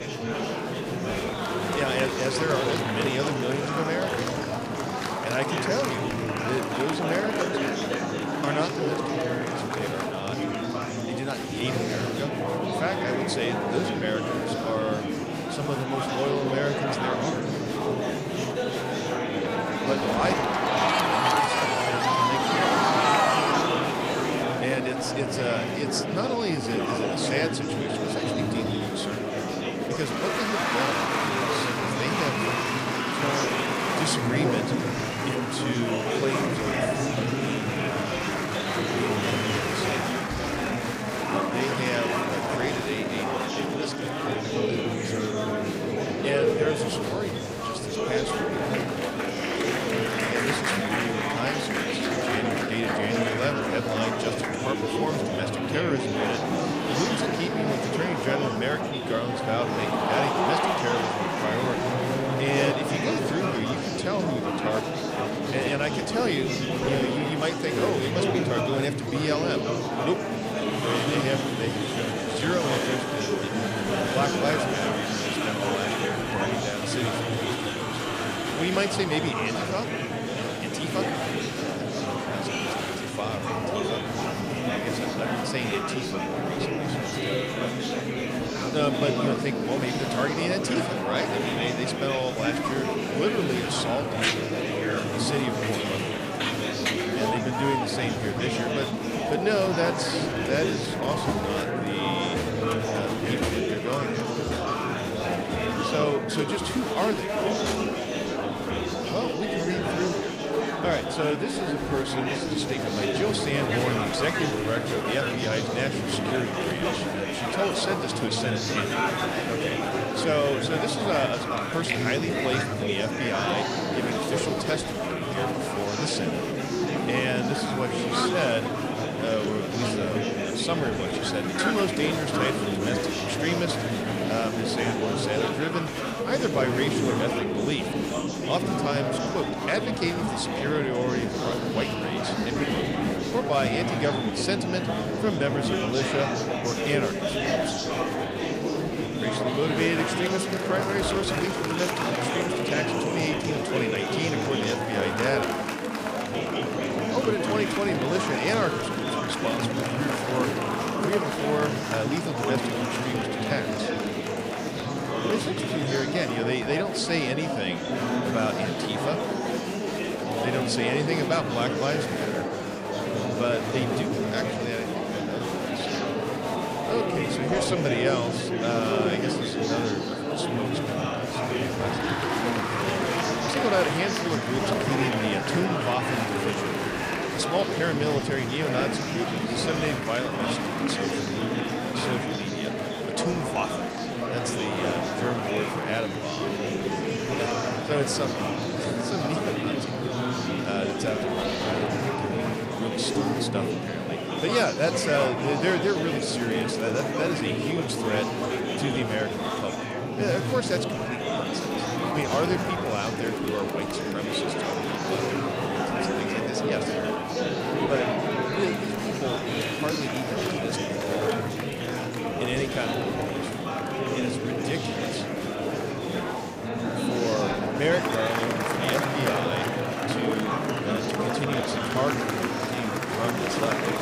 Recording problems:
murmuring crowd; very loud; throughout; 3 dB above the speech

